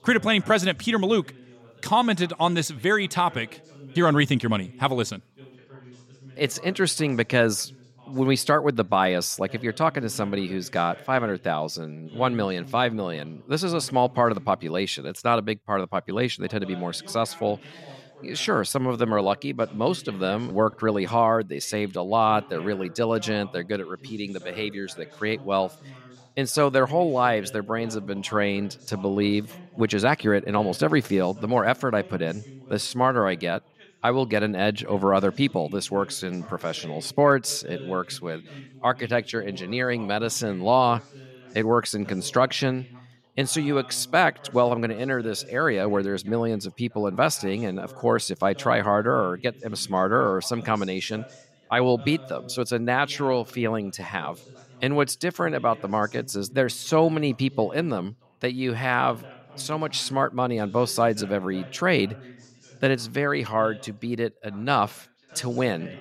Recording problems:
background chatter; faint; throughout; 2 voices, 20 dB below the speech

